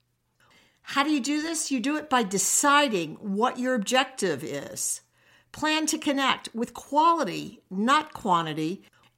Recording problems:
uneven, jittery; slightly; from 0.5 to 8 s

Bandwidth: 16 kHz